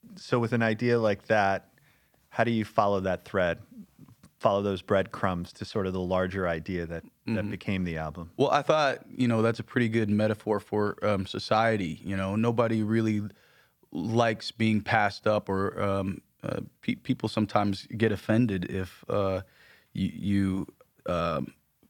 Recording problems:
none

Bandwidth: 18.5 kHz